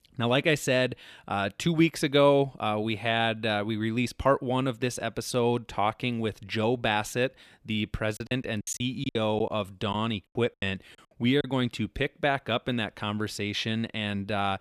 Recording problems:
choppy; very; from 8 to 11 s; 15% of the speech affected

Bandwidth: 15 kHz